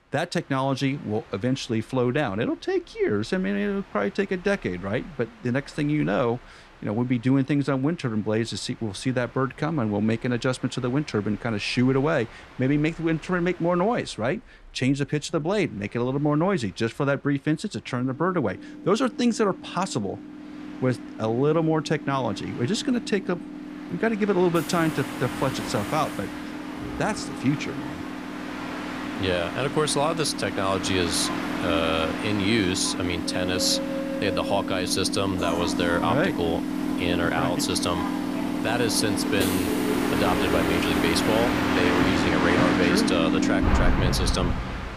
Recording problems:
train or aircraft noise; loud; throughout; 2 dB below the speech

